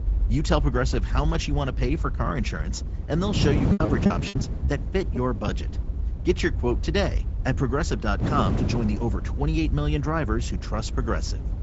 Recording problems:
high frequencies cut off; noticeable; nothing above 7.5 kHz
garbled, watery; slightly
wind noise on the microphone; heavy; 8 dB below the speech
low rumble; noticeable; throughout; 20 dB below the speech
choppy; very; from 3.5 to 5.5 s; 18% of the speech affected

